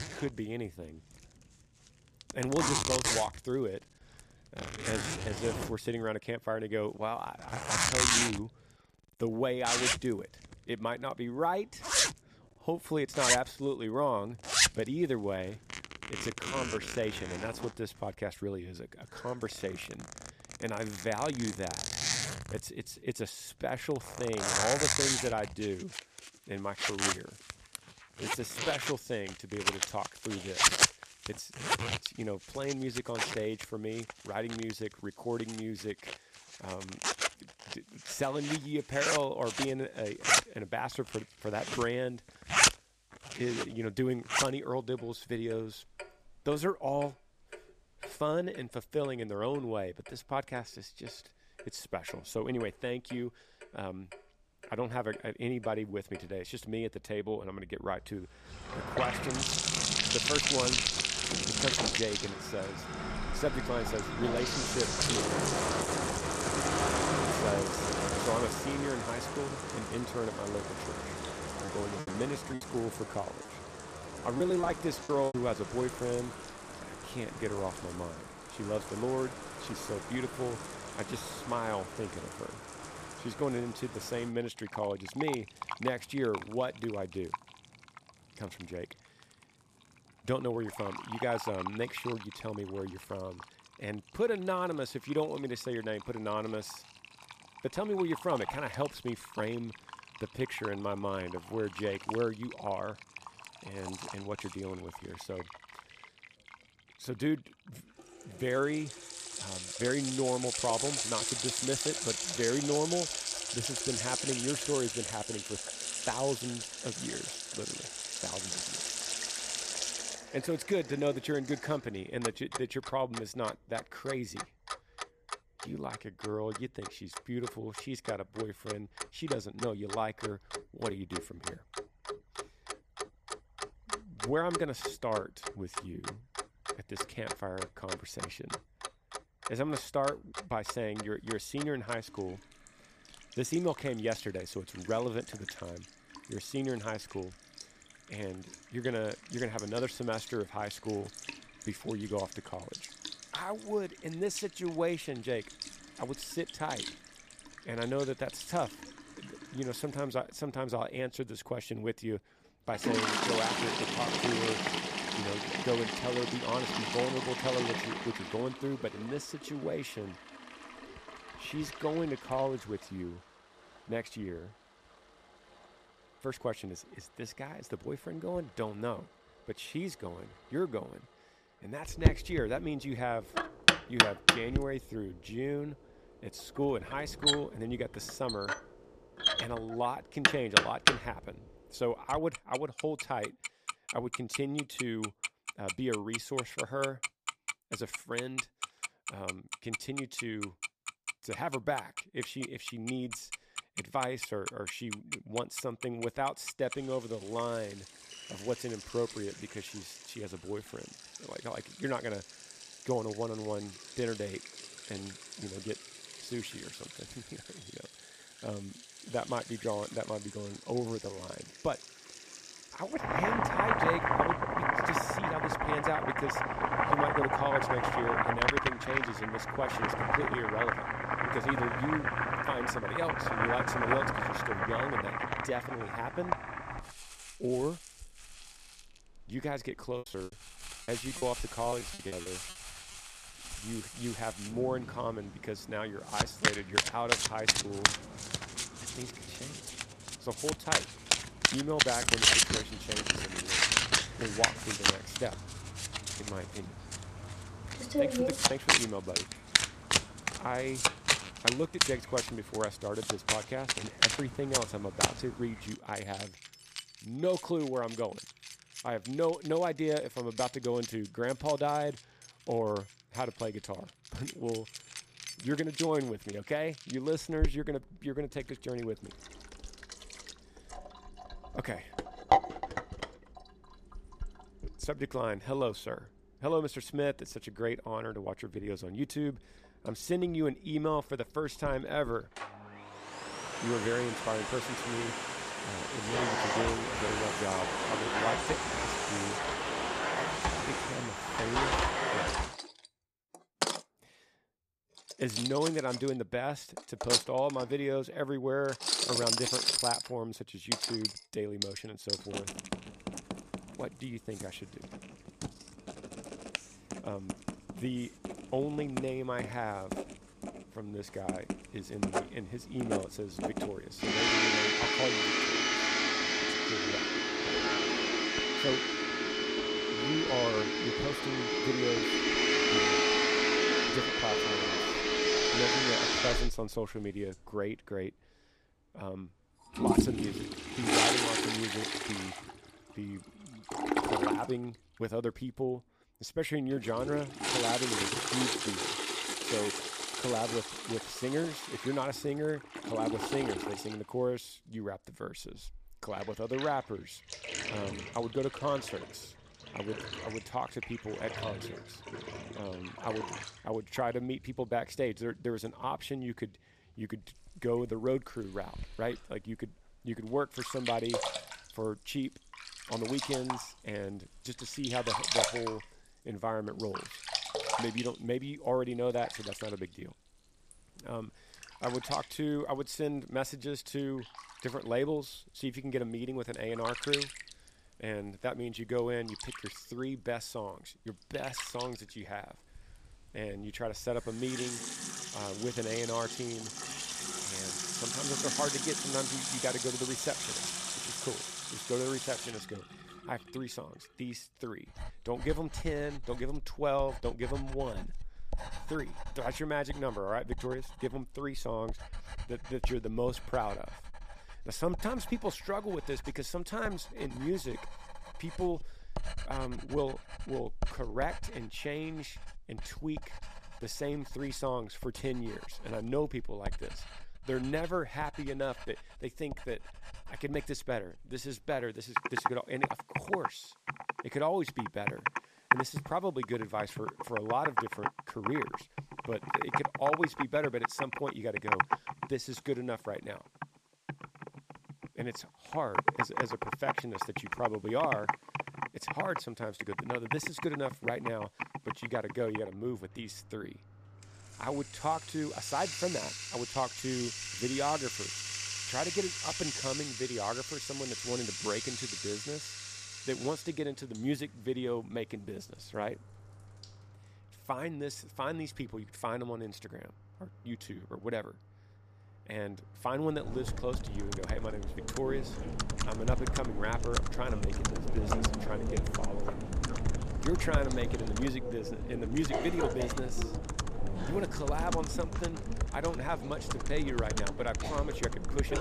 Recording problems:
household noises; very loud; throughout; 3 dB above the speech
choppy; very; from 1:12 to 1:15 and from 4:00 to 4:02; 17% of the speech affected

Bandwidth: 14.5 kHz